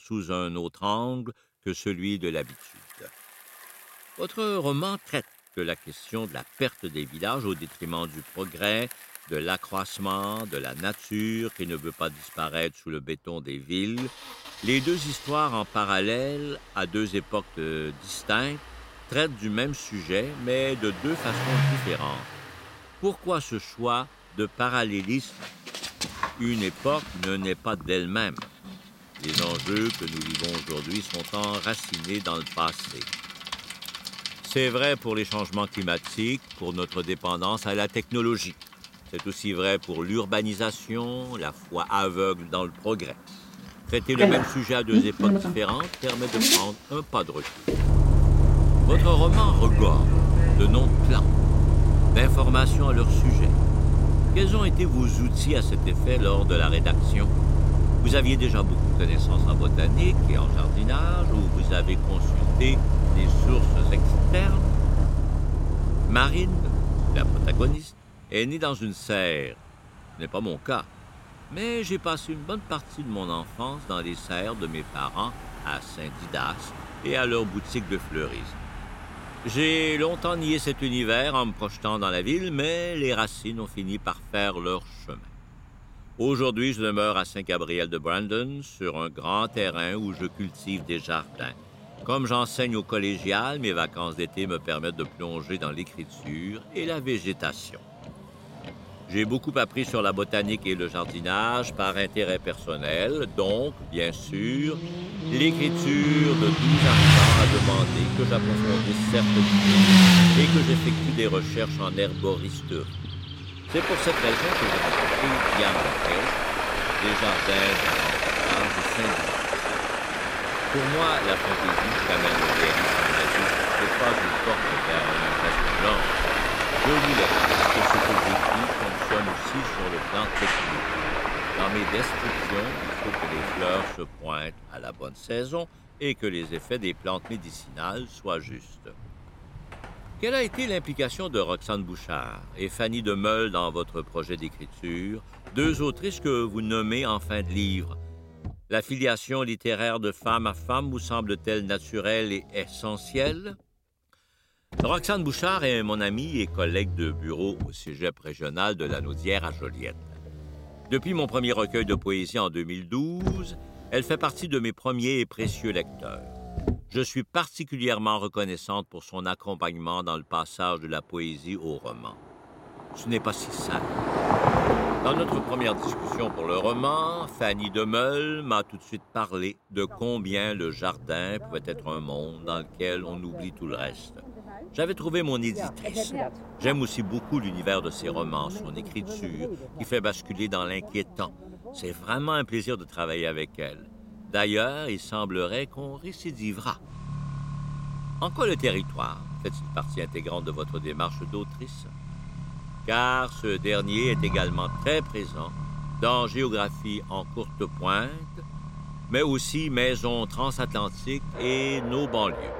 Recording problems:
traffic noise; very loud; throughout; 4 dB above the speech

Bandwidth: 16 kHz